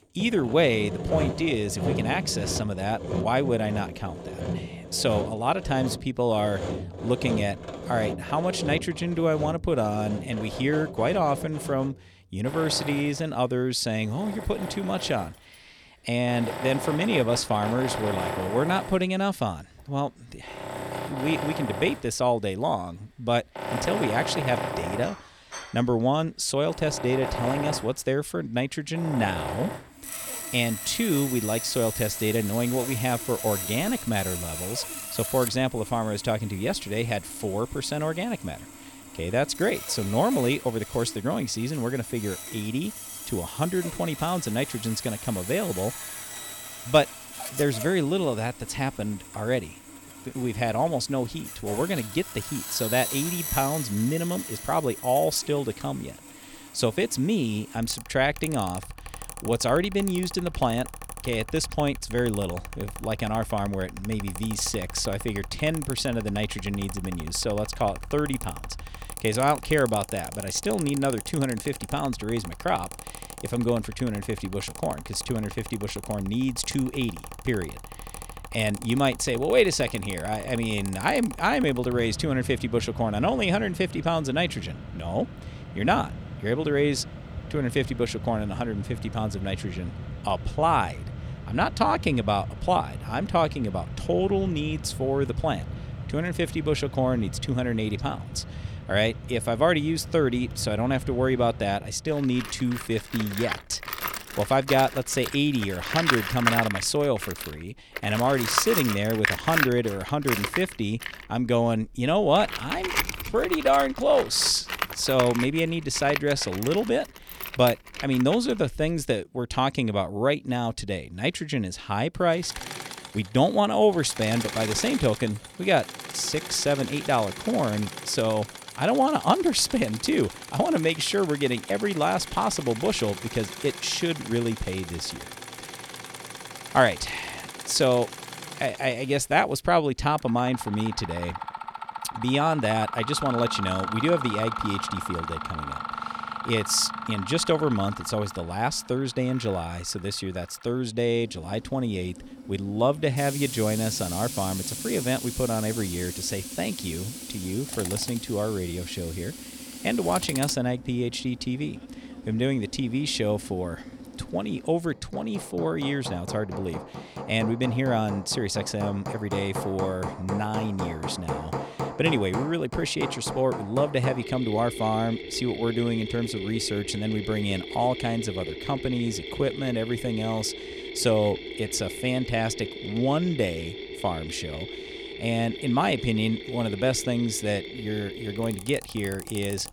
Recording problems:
machinery noise; loud; throughout; 8 dB below the speech

